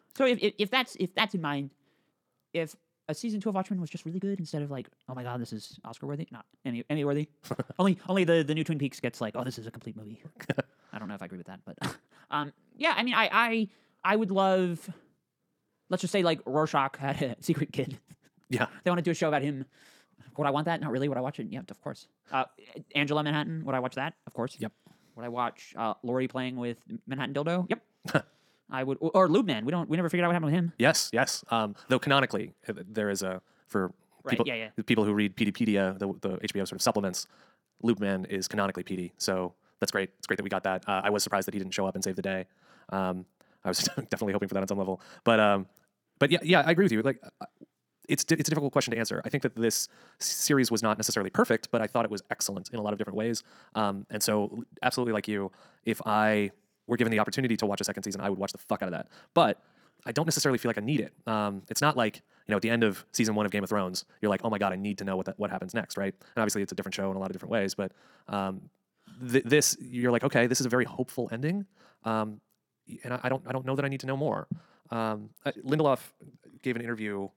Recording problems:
wrong speed, natural pitch; too fast; 1.6 times normal speed

